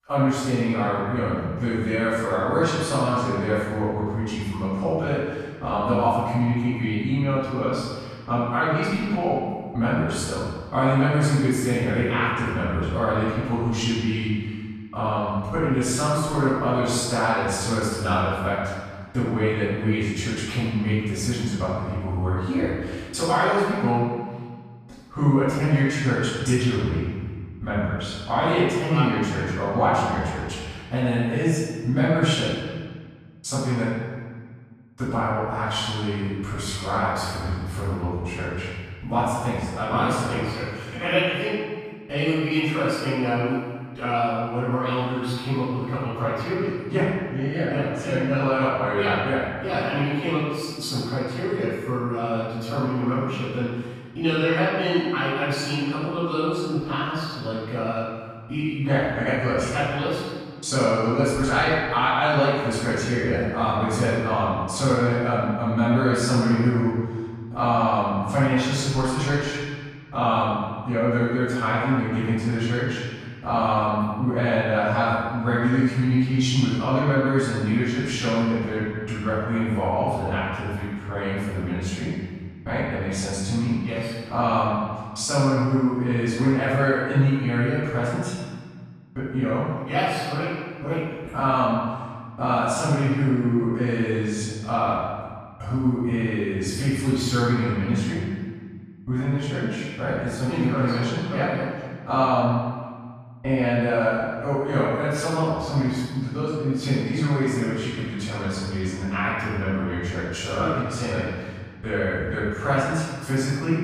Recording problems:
room echo; strong; dies away in 1.5 s
off-mic speech; far

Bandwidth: 14.5 kHz